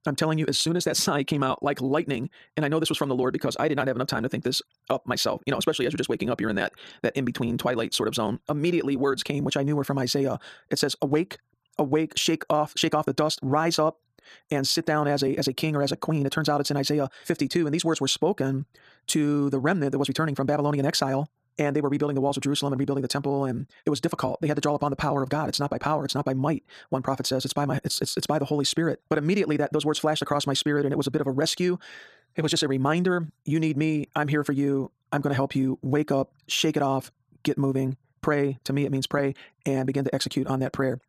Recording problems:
wrong speed, natural pitch; too fast; 1.6 times normal speed

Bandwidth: 14.5 kHz